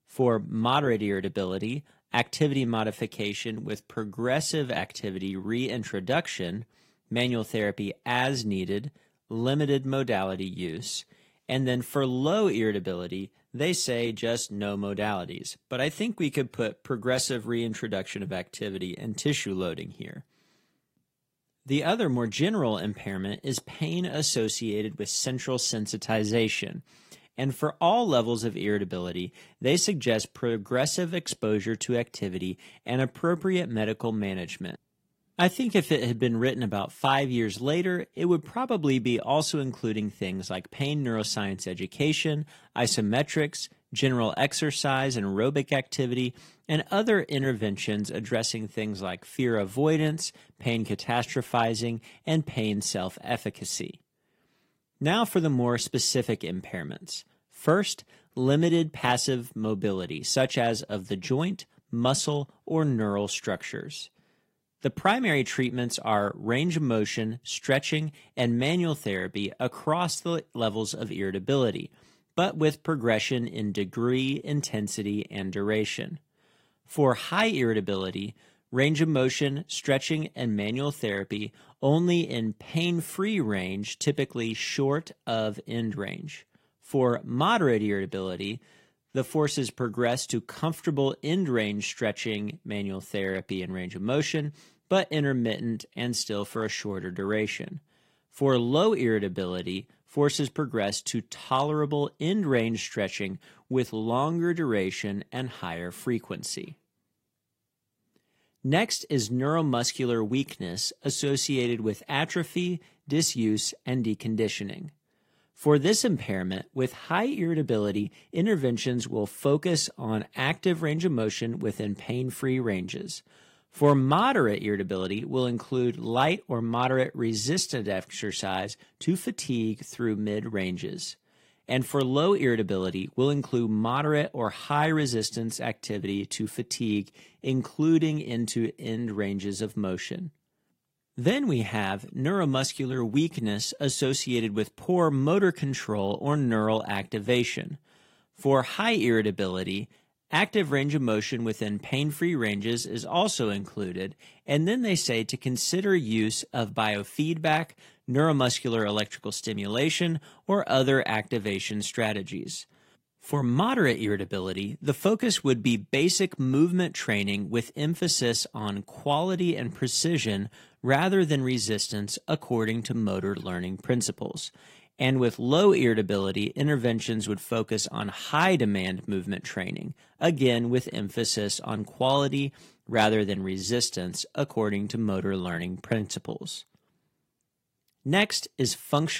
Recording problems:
garbled, watery; slightly; nothing above 15.5 kHz
abrupt cut into speech; at the end

